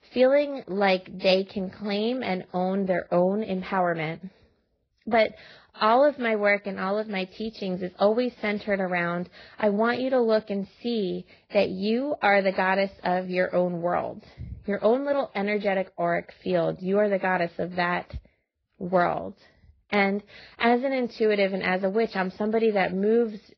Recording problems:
garbled, watery; badly; nothing above 5 kHz

